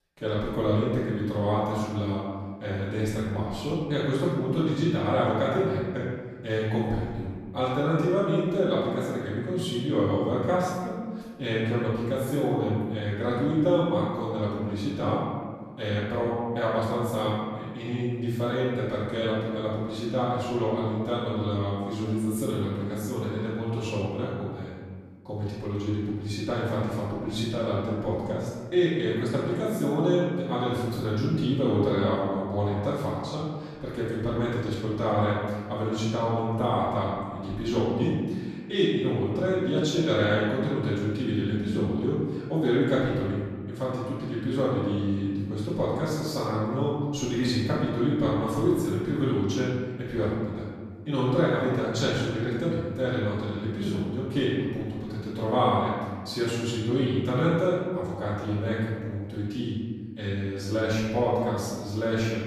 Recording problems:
room echo; strong; dies away in 1.5 s
off-mic speech; far

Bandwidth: 14 kHz